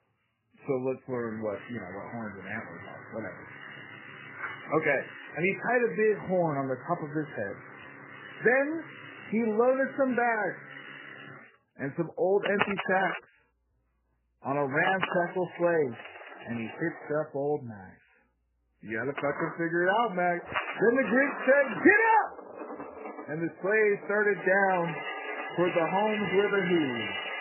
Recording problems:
garbled, watery; badly; nothing above 2.5 kHz
household noises; loud; throughout; 10 dB below the speech

